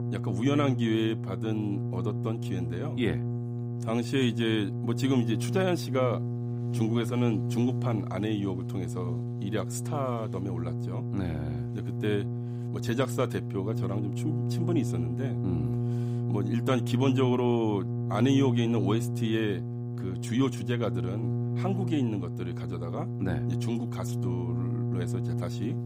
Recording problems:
electrical hum; loud; throughout; 60 Hz, 7 dB below the speech

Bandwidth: 15.5 kHz